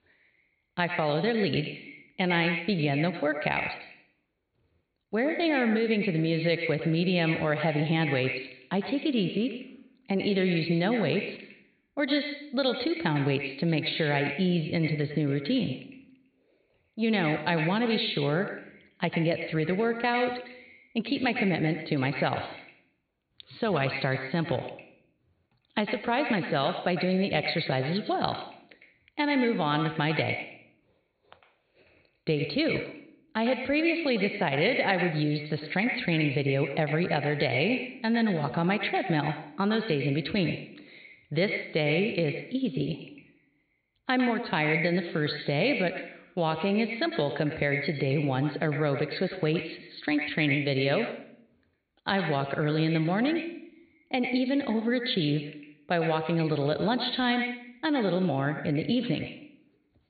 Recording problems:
echo of what is said; strong; throughout; 100 ms later, 7 dB below the speech
high frequencies cut off; severe; nothing above 4.5 kHz

